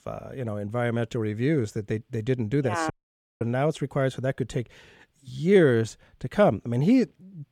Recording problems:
audio cutting out; at 3 s for 0.5 s

